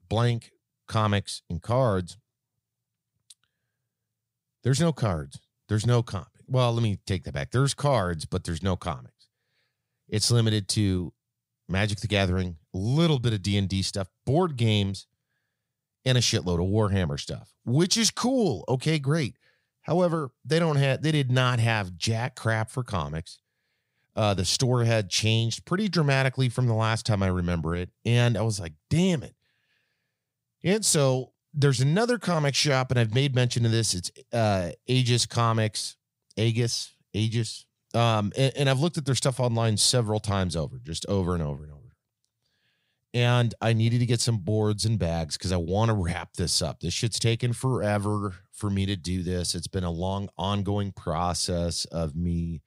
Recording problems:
none

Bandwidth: 15.5 kHz